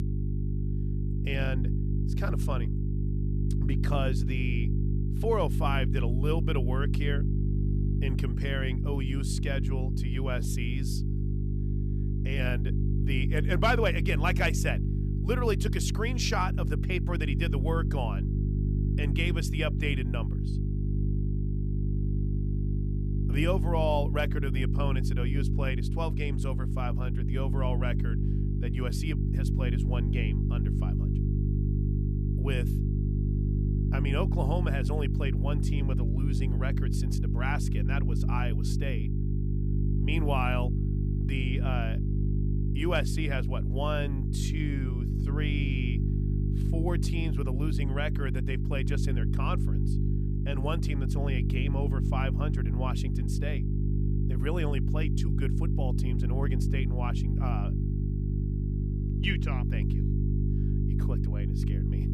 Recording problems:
electrical hum; loud; throughout; 50 Hz, 6 dB below the speech

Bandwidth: 14.5 kHz